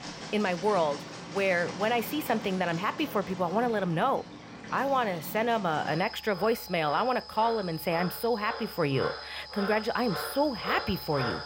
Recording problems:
animal sounds; noticeable; throughout; 10 dB below the speech

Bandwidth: 16 kHz